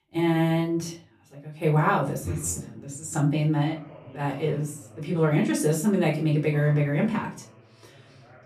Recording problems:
off-mic speech; far
room echo; very slight; dies away in 0.3 s
voice in the background; faint; throughout; 25 dB below the speech

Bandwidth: 14 kHz